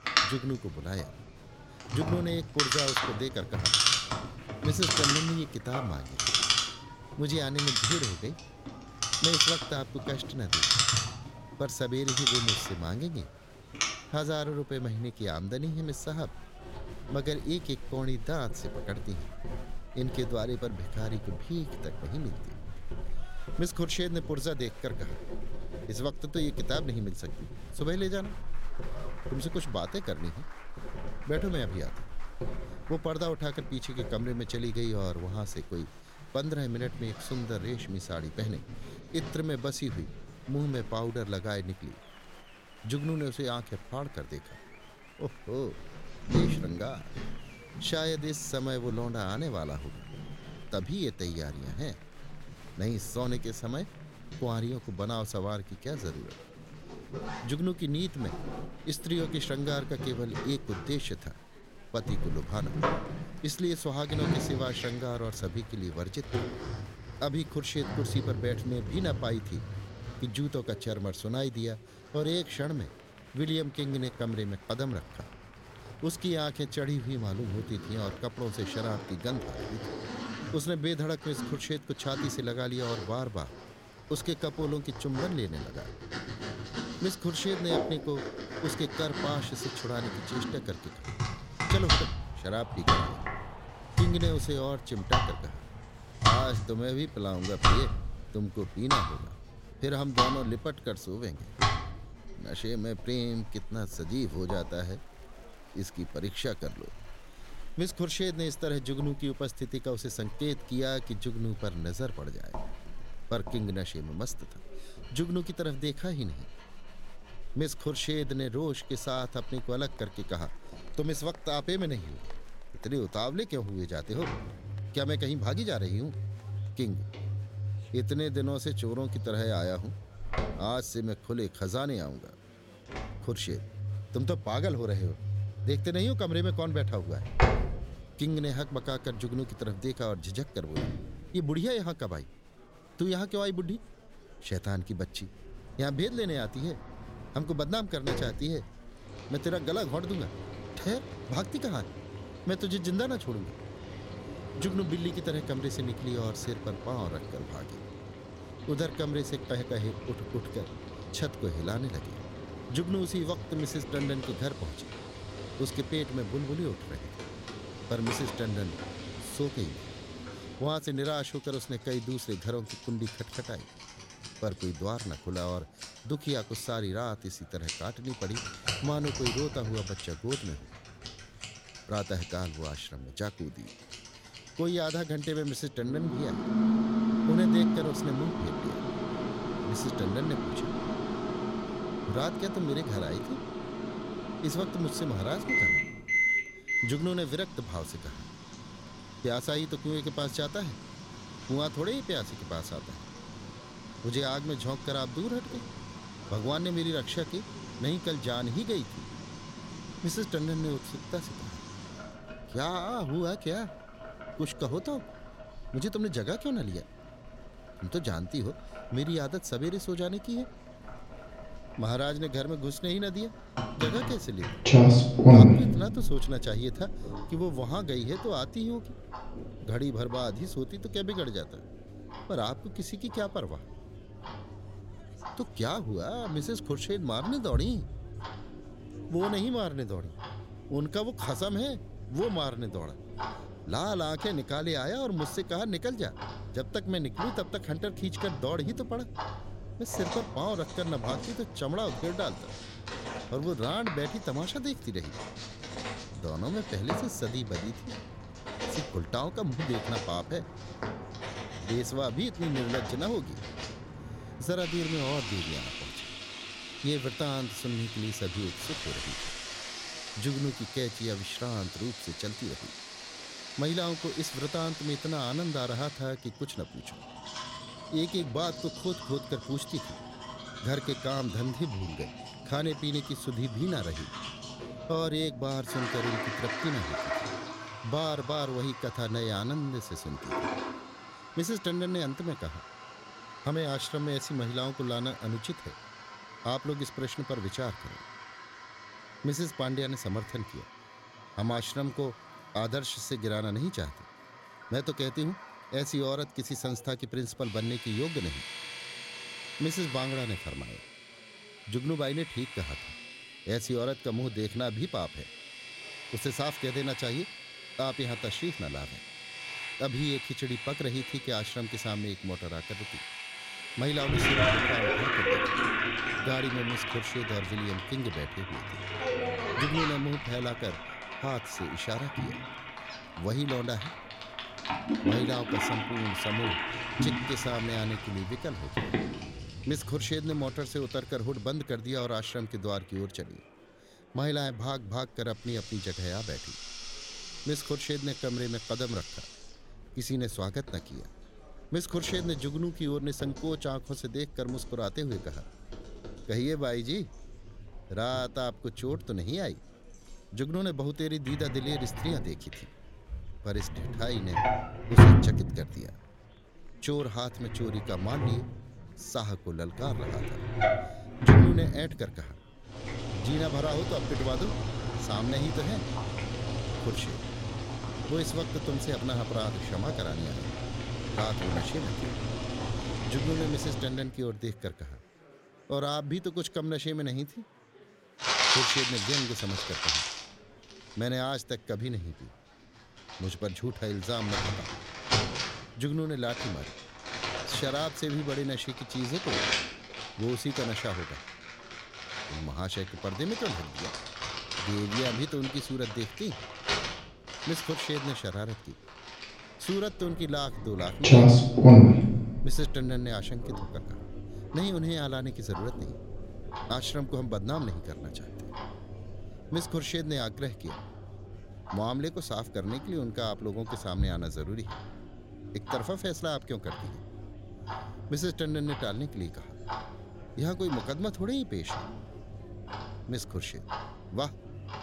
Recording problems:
household noises; very loud; throughout; 3 dB above the speech
murmuring crowd; faint; throughout; 20 dB below the speech

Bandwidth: 16 kHz